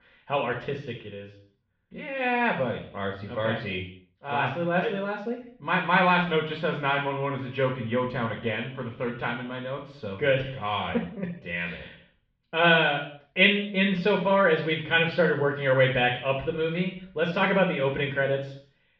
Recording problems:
off-mic speech; far
muffled; very; fading above 3.5 kHz
room echo; noticeable; dies away in 0.5 s

